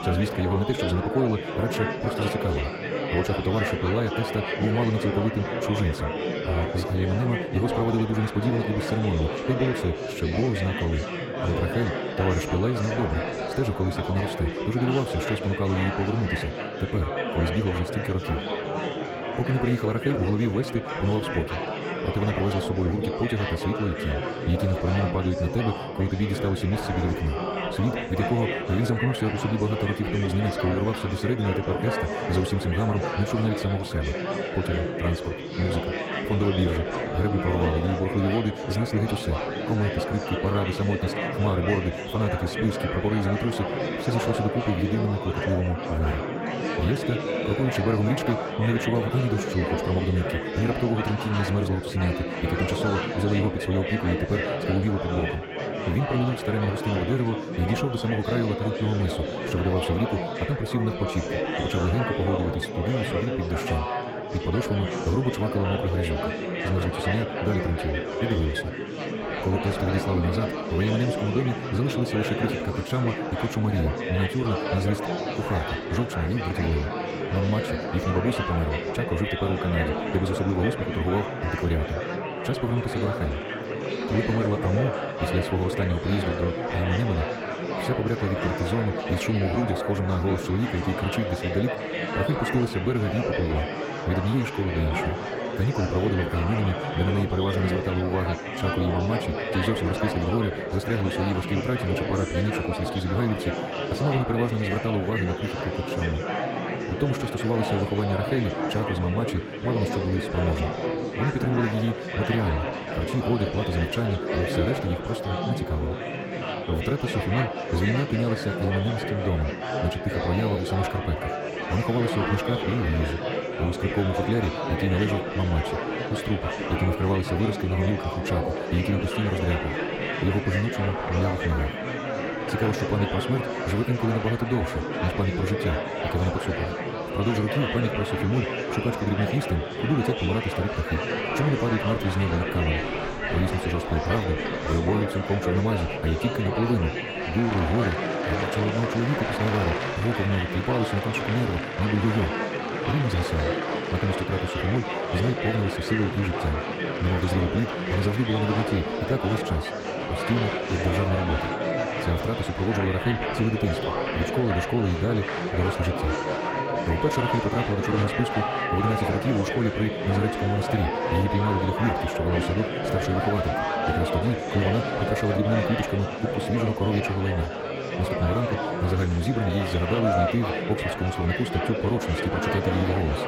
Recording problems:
wrong speed, natural pitch; too fast; 1.5 times normal speed
murmuring crowd; loud; throughout; 2 dB below the speech

